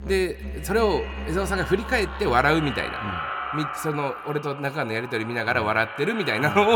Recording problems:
echo of what is said; strong; throughout; 190 ms later, 9 dB below the speech
background music; noticeable; throughout; 10 dB below the speech
abrupt cut into speech; at the end

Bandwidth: 18 kHz